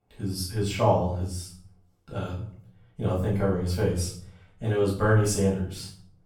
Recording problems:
off-mic speech; far
room echo; noticeable; dies away in 0.5 s

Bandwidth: 18 kHz